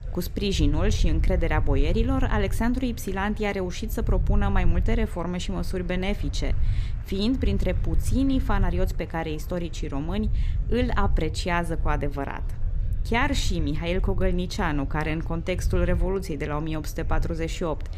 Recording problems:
low rumble; noticeable; throughout; 20 dB below the speech
murmuring crowd; faint; throughout; 25 dB below the speech

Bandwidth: 14.5 kHz